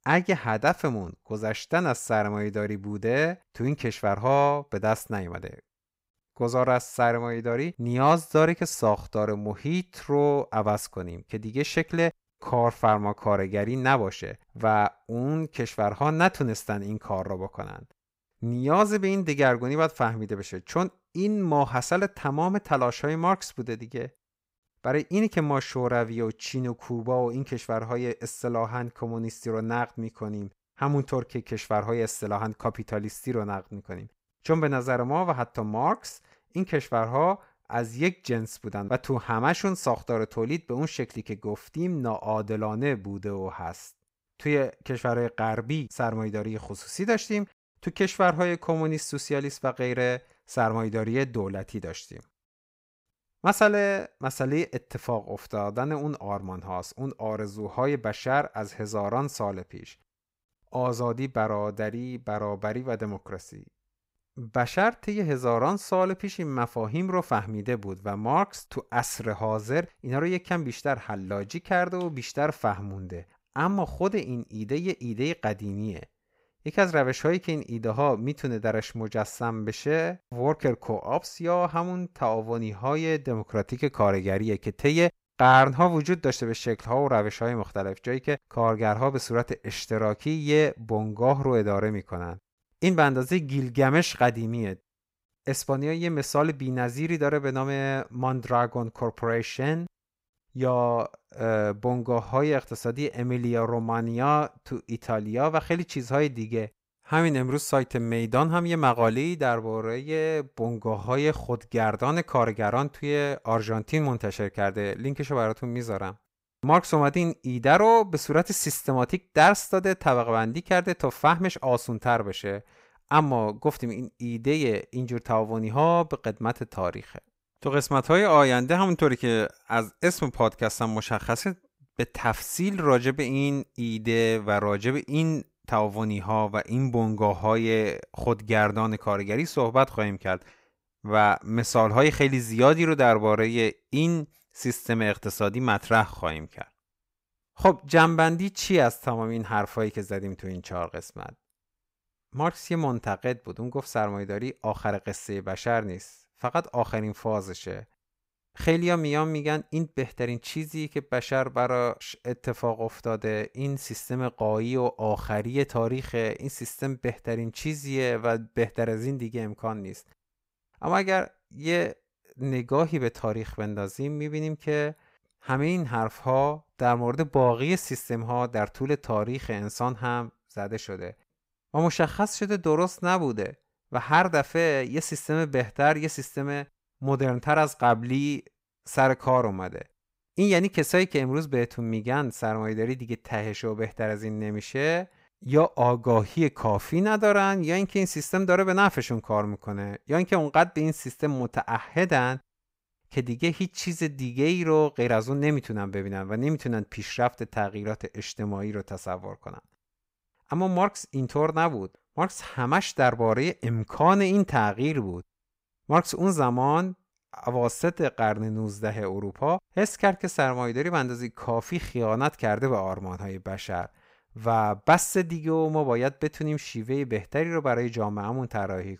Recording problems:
none

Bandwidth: 15.5 kHz